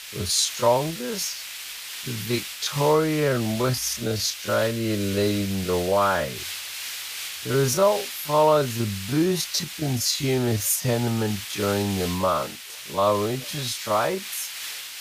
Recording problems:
wrong speed, natural pitch; too slow; 0.5 times normal speed
hiss; loud; throughout; 9 dB below the speech

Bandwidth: 15 kHz